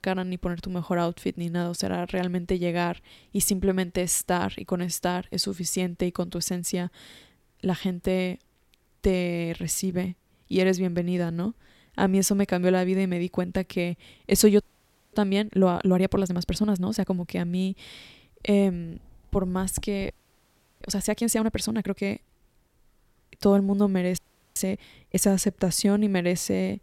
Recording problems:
audio freezing; at 15 s for 0.5 s, at 20 s for 0.5 s and at 24 s

